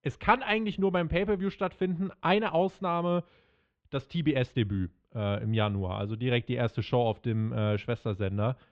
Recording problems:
muffled; very; fading above 3 kHz

